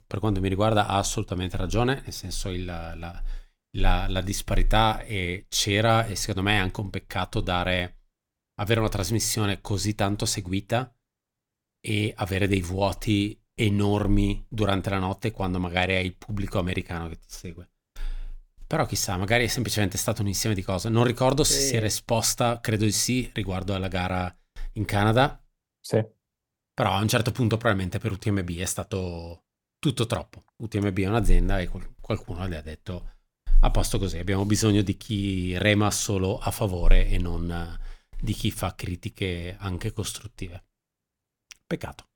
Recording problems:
none

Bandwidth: 18 kHz